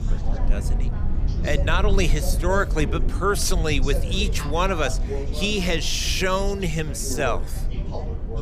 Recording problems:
background chatter; noticeable; throughout; 4 voices, 10 dB below the speech
low rumble; noticeable; throughout; 20 dB below the speech

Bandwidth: 15 kHz